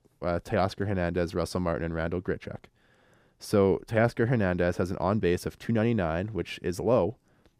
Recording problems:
none

